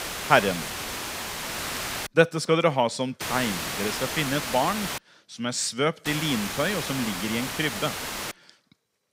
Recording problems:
hiss; loud; until 2 s, from 3 to 5 s and from 6 to 8.5 s; 5 dB below the speech

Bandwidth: 15.5 kHz